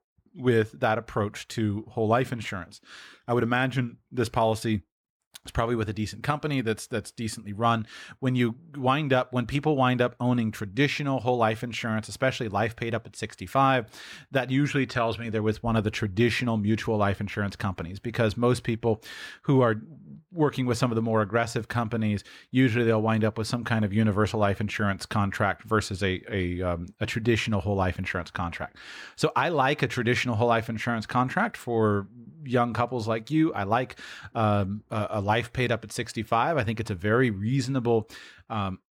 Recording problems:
none

